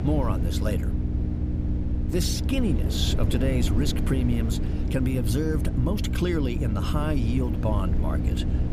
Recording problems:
electrical hum; loud; throughout; 60 Hz, 8 dB below the speech
low rumble; loud; throughout; 8 dB below the speech

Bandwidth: 15 kHz